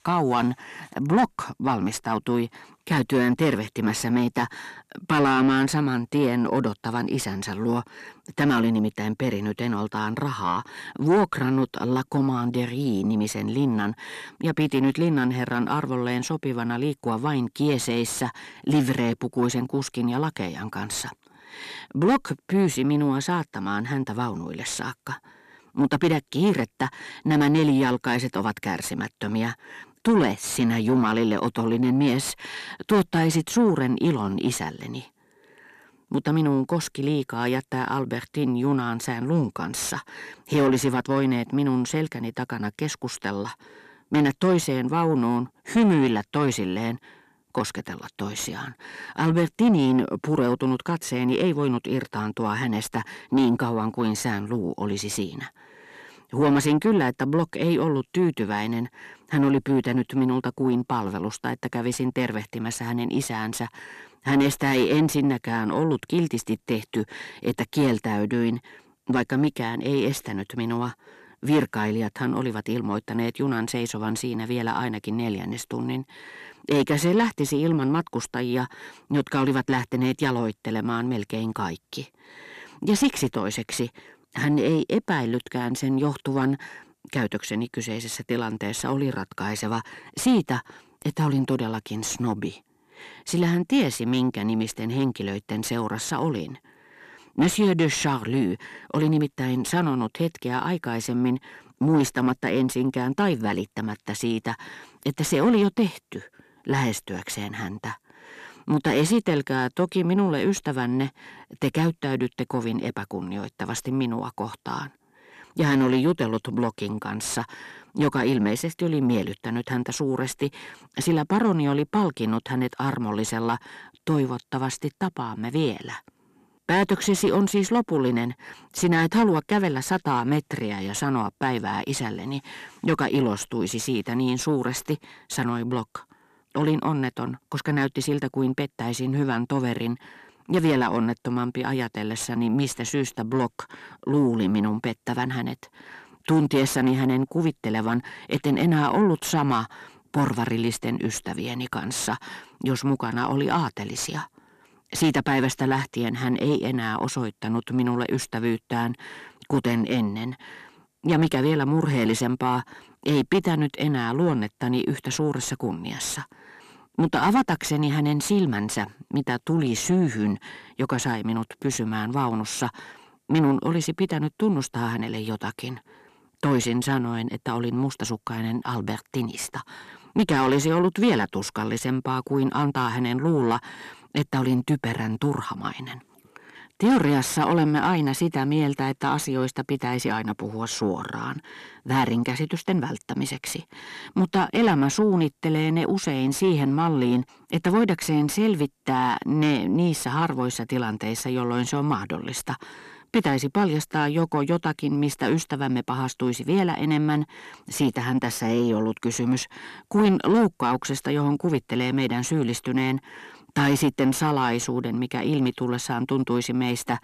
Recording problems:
distortion; slight; 10 dB below the speech

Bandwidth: 13.5 kHz